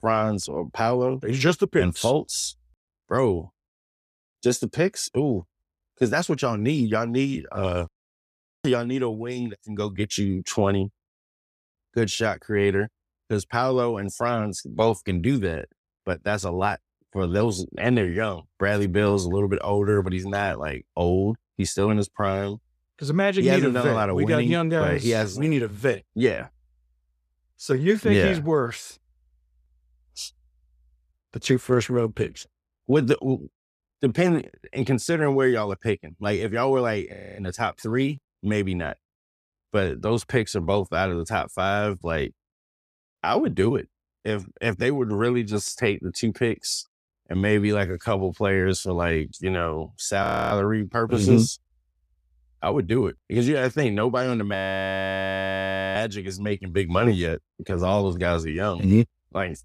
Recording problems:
audio freezing; at 37 s, at 50 s and at 55 s for 1.5 s

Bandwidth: 14.5 kHz